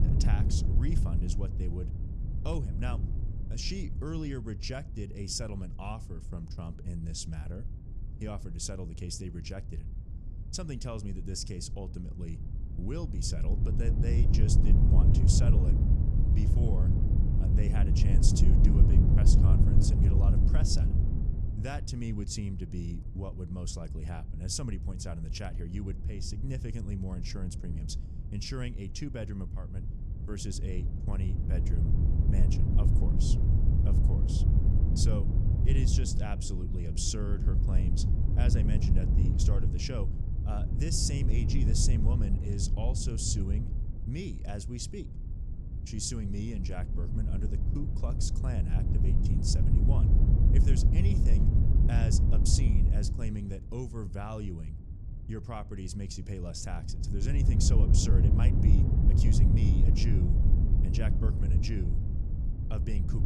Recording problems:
wind noise on the microphone; heavy; 1 dB below the speech

